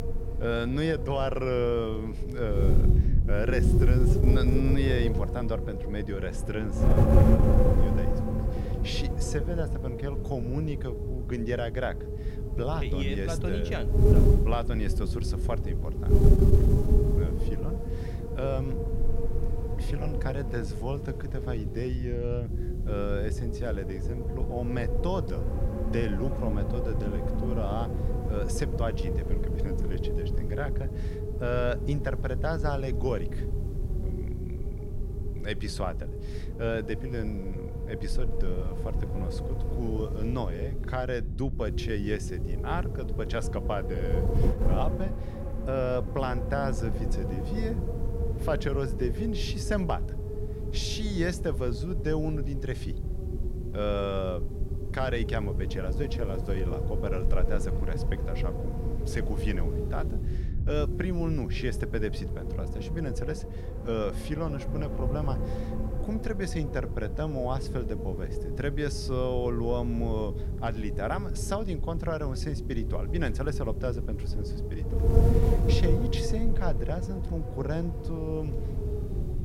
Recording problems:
wind noise on the microphone; heavy; 4 dB below the speech

